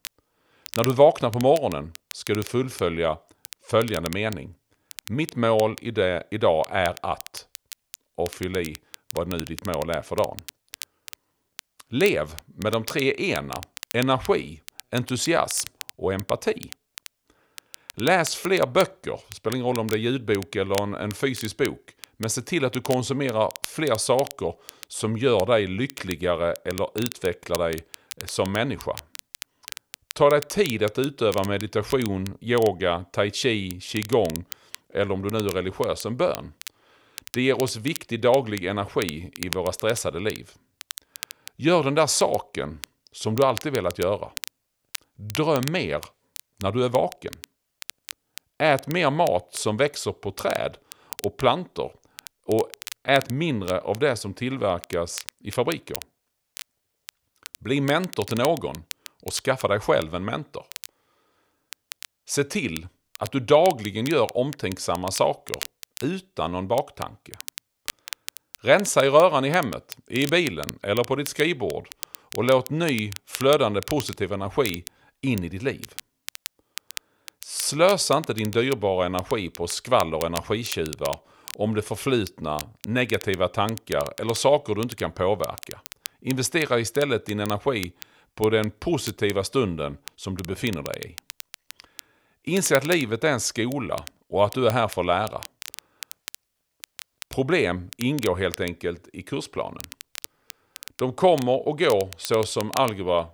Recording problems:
crackle, like an old record; noticeable; 15 dB below the speech

